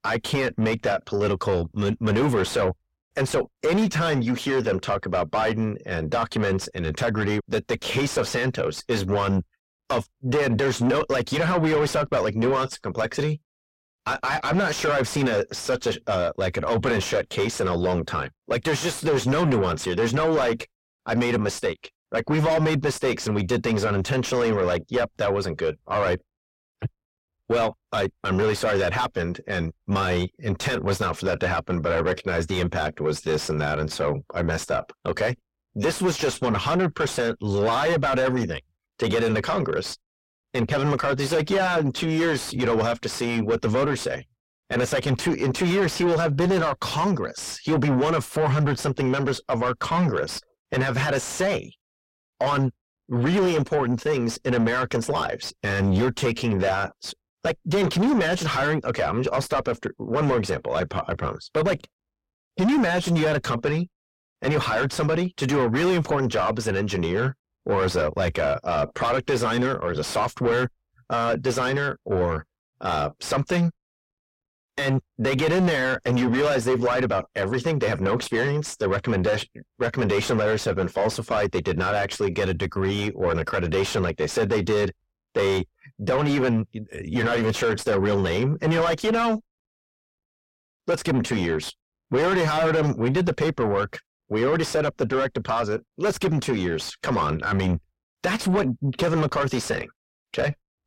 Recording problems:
distortion; heavy; 5 dB below the speech

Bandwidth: 16 kHz